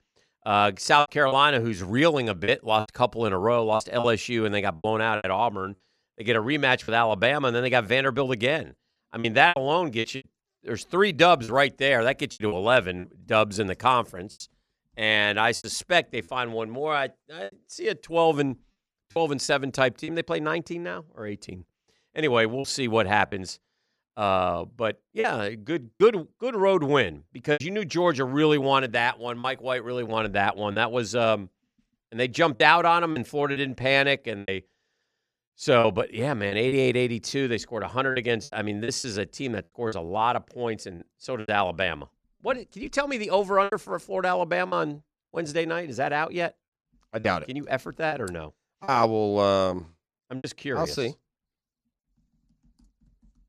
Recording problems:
choppy; very; 7% of the speech affected

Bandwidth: 14.5 kHz